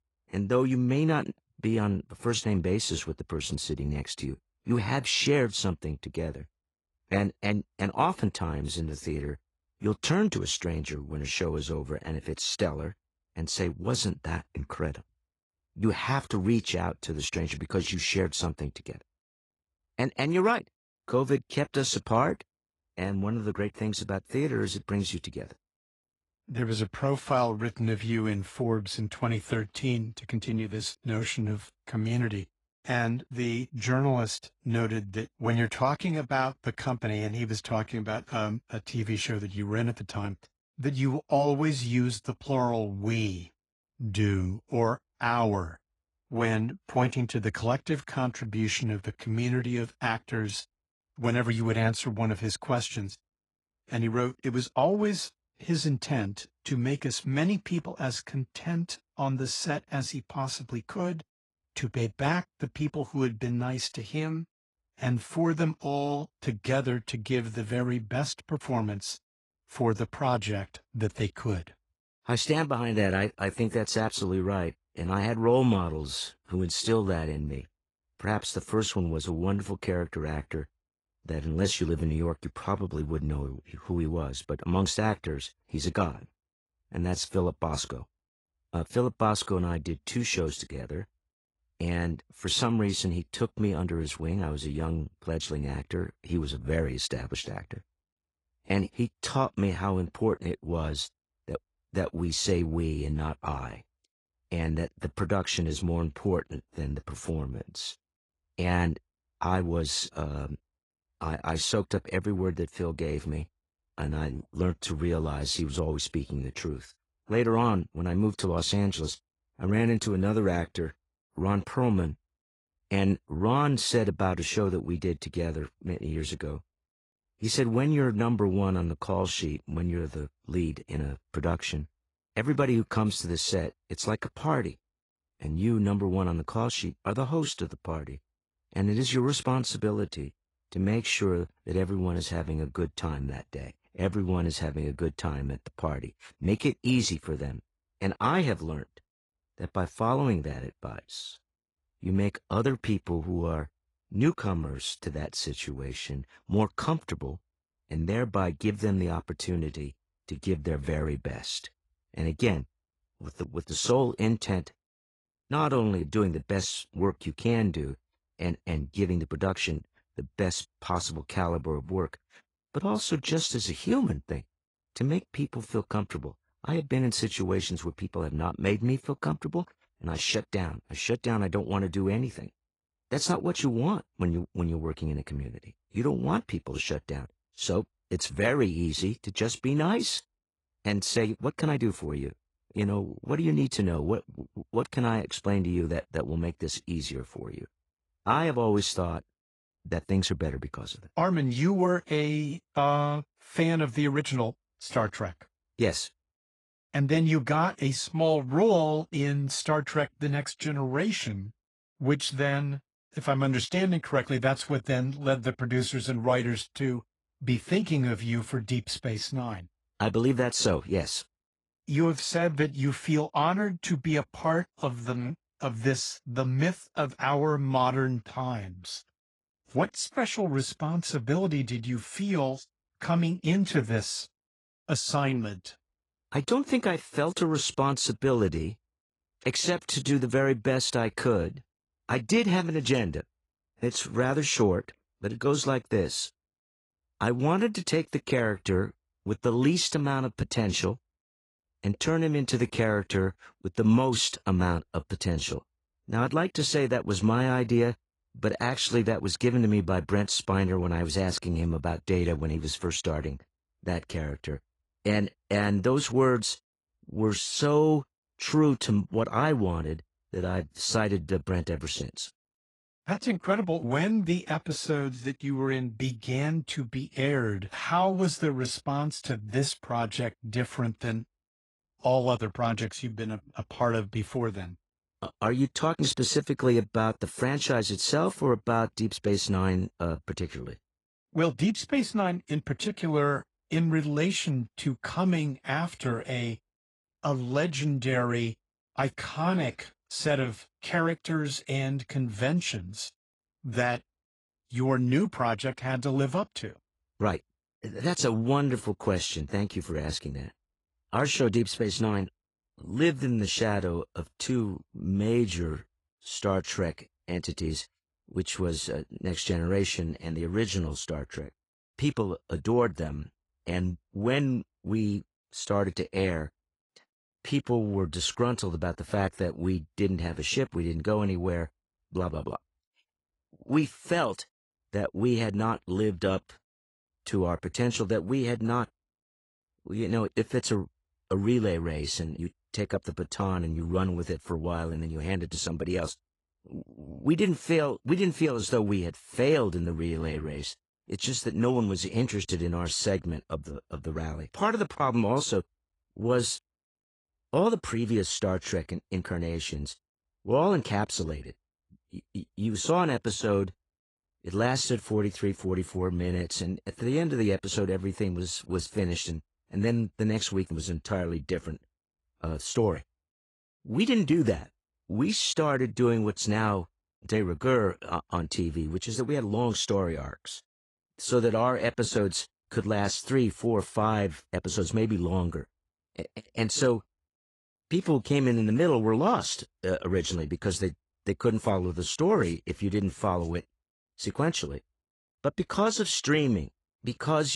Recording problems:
garbled, watery; slightly; nothing above 10.5 kHz
abrupt cut into speech; at the end

